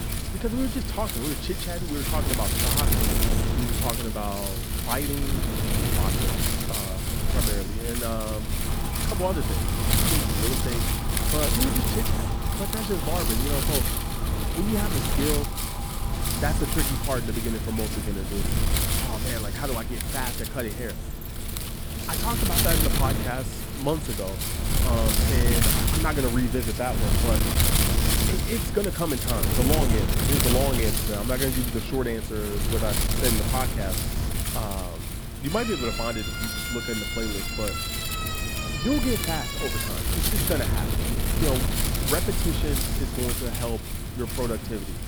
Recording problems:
wind noise on the microphone; heavy; 2 dB above the speech
siren; noticeable; from 8.5 to 17 s; peak 9 dB below the speech
jangling keys; faint; from 21 to 22 s; peak 15 dB below the speech
siren; loud; from 35 to 40 s; peak level with the speech

